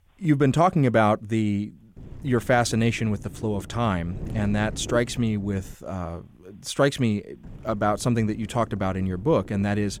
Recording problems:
wind noise on the microphone; occasional gusts; from 2 to 6 s and from 7.5 s on; 20 dB below the speech

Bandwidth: 17.5 kHz